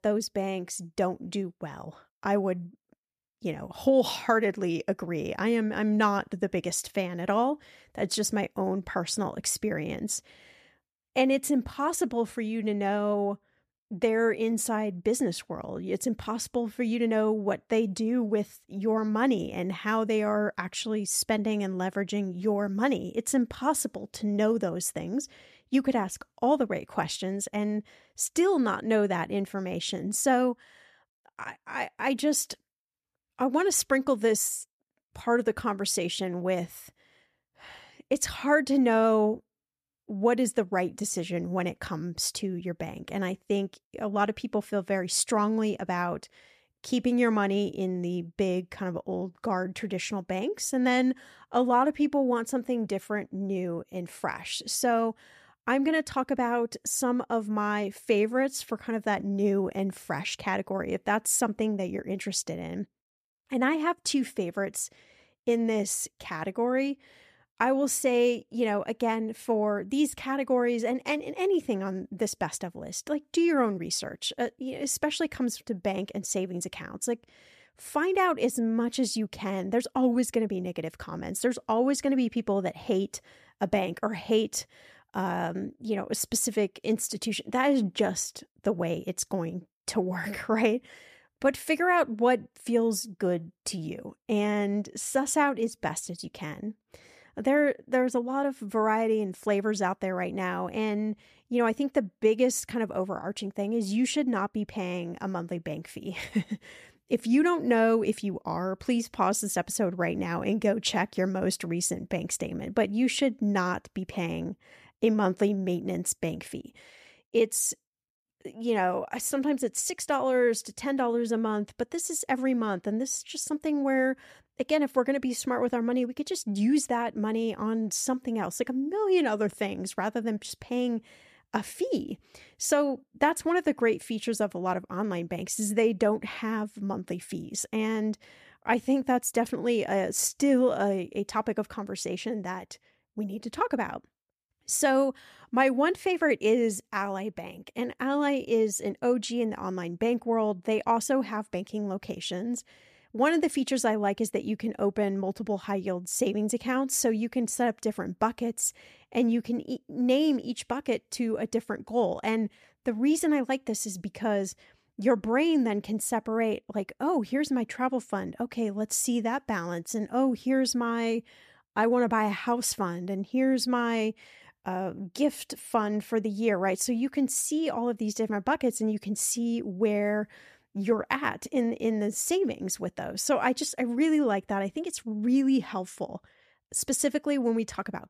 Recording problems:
none

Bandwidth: 14.5 kHz